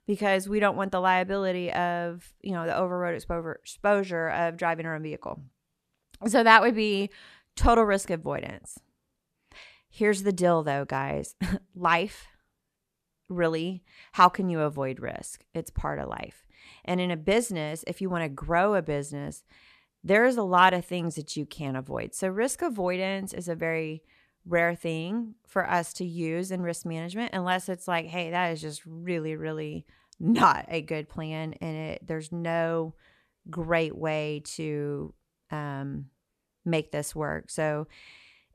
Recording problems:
none

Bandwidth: 13.5 kHz